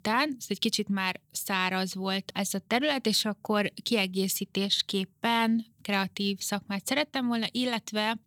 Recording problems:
none

